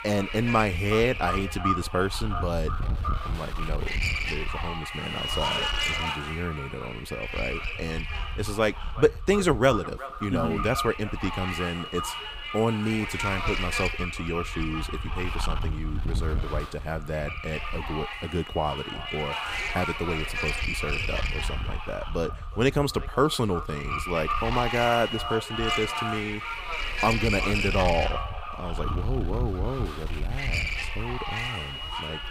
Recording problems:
echo of what is said; strong; throughout; 370 ms later, 10 dB below the speech
wind noise on the microphone; heavy; 1 dB below the speech

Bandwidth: 15.5 kHz